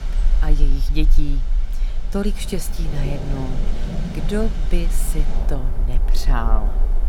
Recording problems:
rain or running water; loud; throughout; 5 dB below the speech
low rumble; noticeable; throughout; 20 dB below the speech
electrical hum; faint; throughout; 60 Hz, 30 dB below the speech

